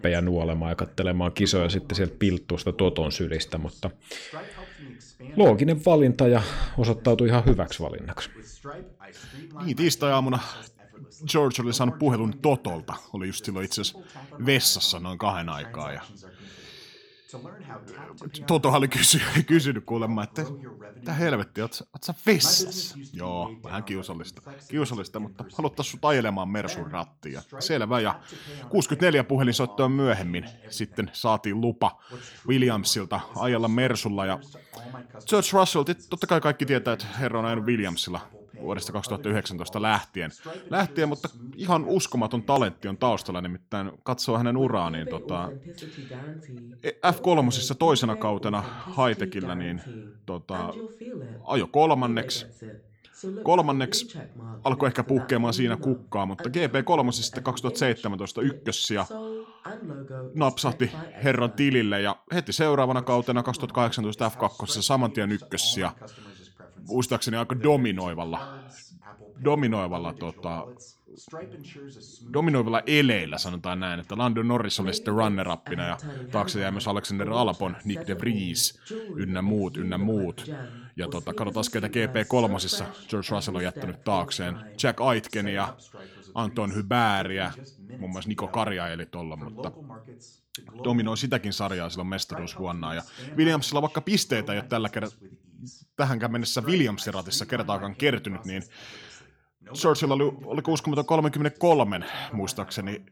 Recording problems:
voice in the background; noticeable; throughout; 15 dB below the speech

